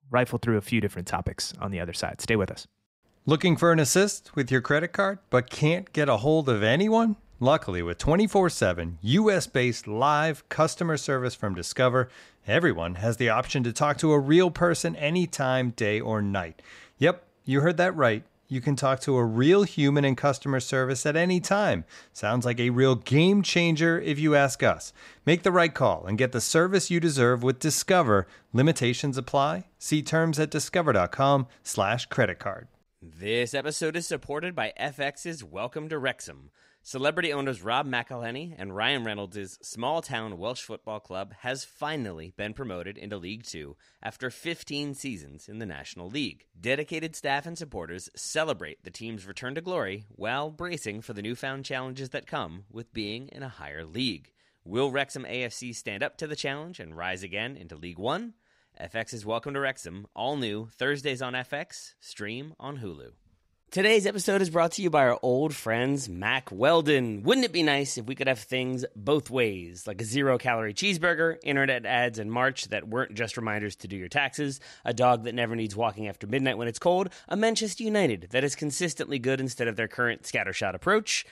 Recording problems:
none

